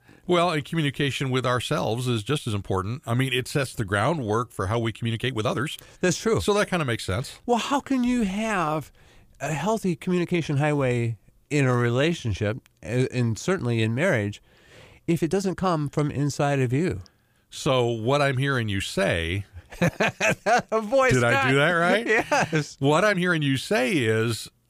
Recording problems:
uneven, jittery; strongly; from 2.5 to 23 s

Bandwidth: 15 kHz